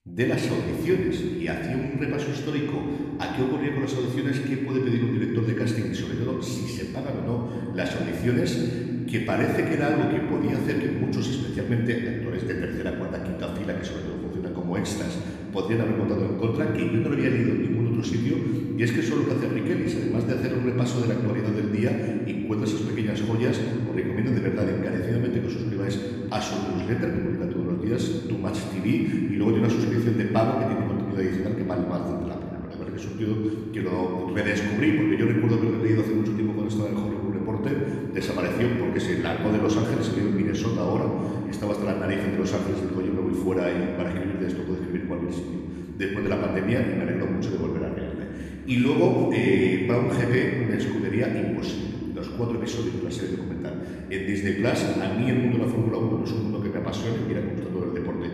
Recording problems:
room echo; noticeable; dies away in 3 s
off-mic speech; somewhat distant

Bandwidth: 14.5 kHz